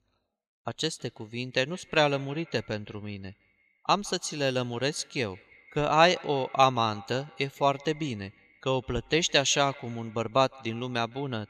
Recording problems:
echo of what is said; faint; throughout; 160 ms later, 25 dB below the speech

